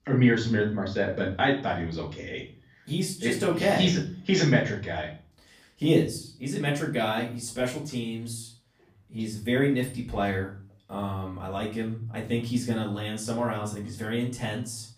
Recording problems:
off-mic speech; far
room echo; slight; dies away in 0.4 s

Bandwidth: 15 kHz